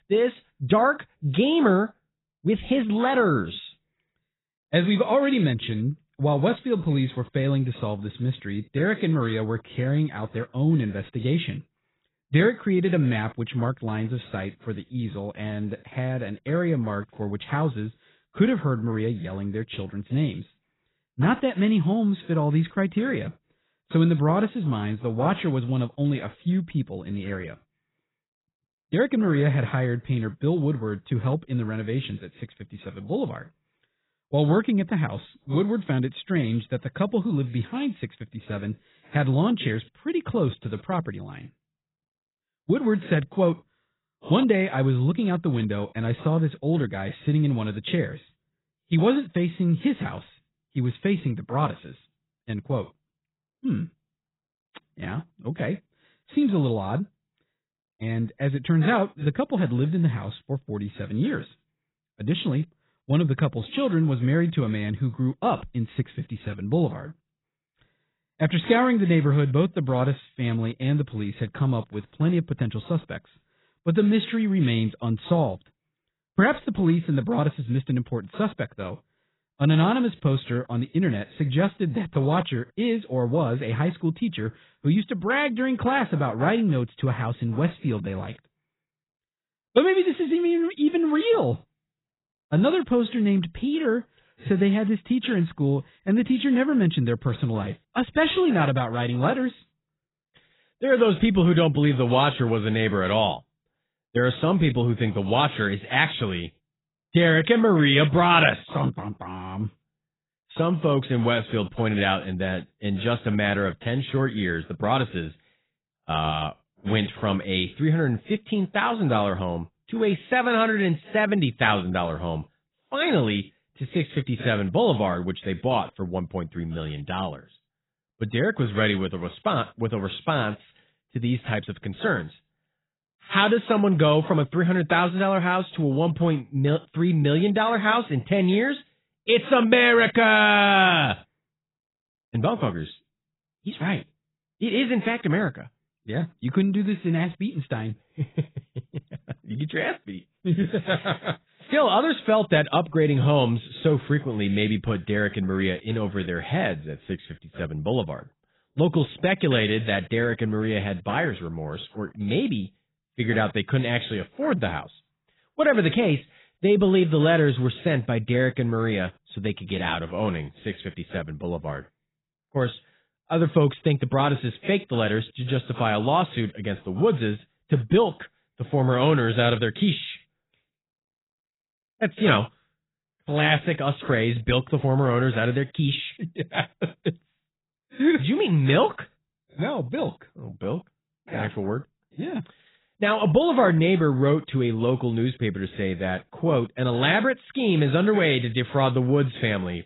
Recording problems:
garbled, watery; badly; nothing above 4 kHz

